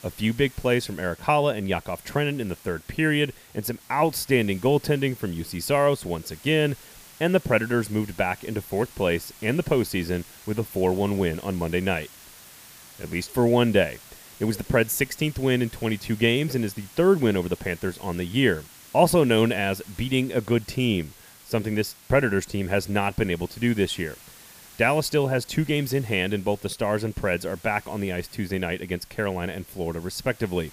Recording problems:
hiss; faint; throughout; 20 dB below the speech

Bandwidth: 15 kHz